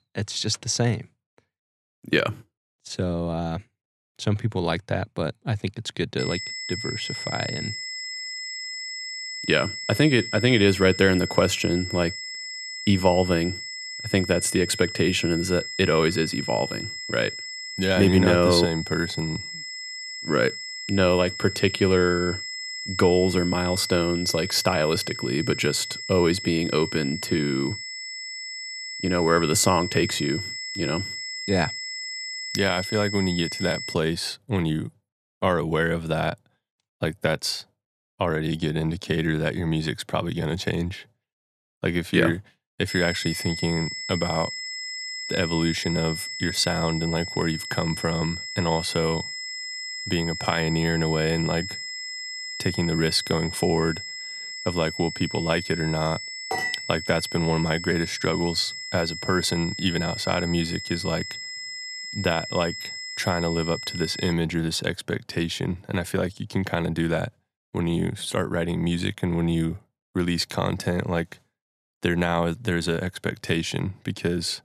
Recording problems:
high-pitched whine; loud; from 6 to 34 s and from 43 s to 1:04; 2 kHz, 7 dB below the speech

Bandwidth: 13.5 kHz